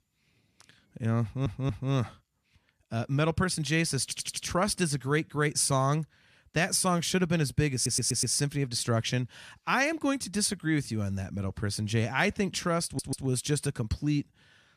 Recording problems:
audio stuttering; 4 times, first at 1 s

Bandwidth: 14 kHz